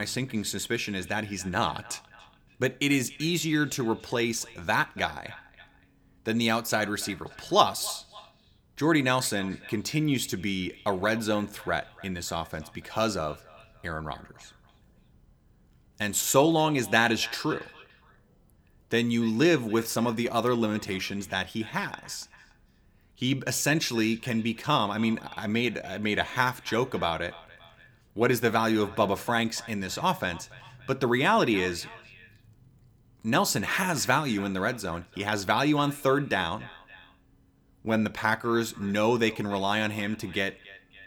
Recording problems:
echo of what is said; faint; throughout; 290 ms later, 20 dB below the speech
abrupt cut into speech; at the start

